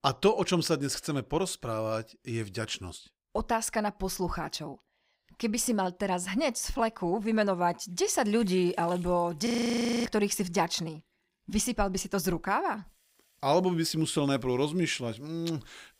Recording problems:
household noises; faint; from 8.5 s on; 30 dB below the speech
audio freezing; at 9.5 s for 0.5 s

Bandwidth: 15.5 kHz